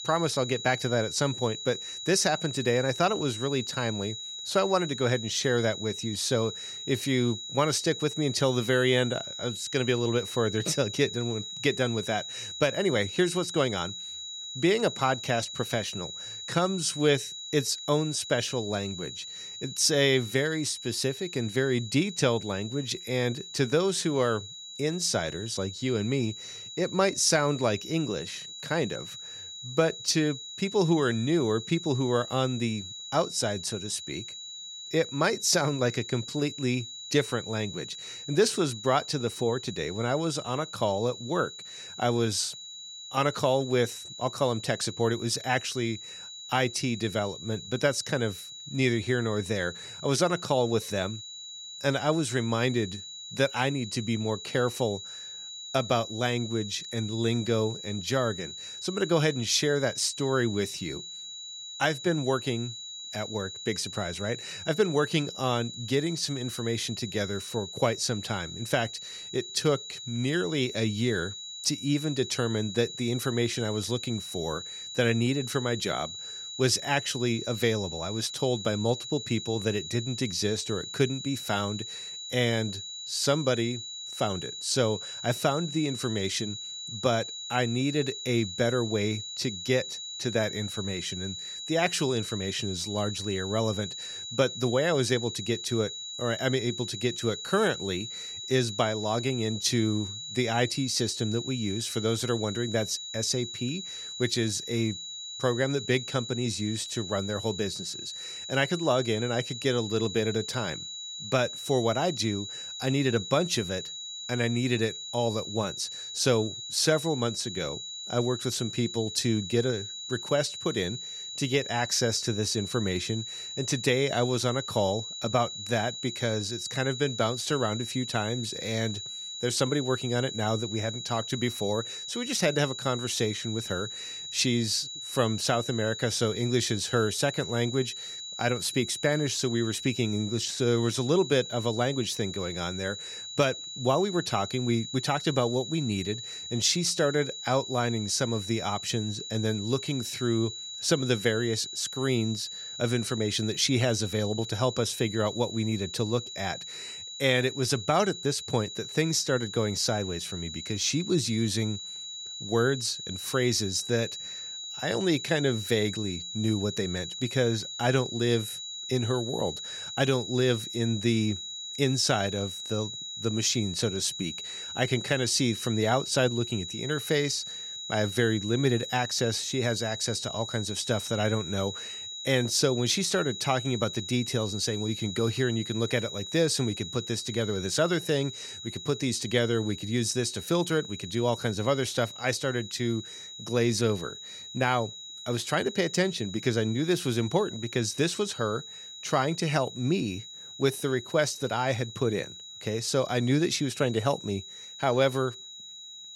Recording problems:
high-pitched whine; loud; throughout; 4 kHz, 8 dB below the speech

